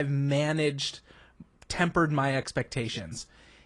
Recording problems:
garbled, watery; slightly
abrupt cut into speech; at the start

